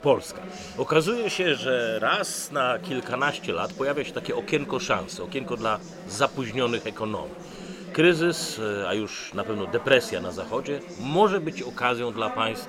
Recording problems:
chatter from many people; noticeable; throughout; 15 dB below the speech

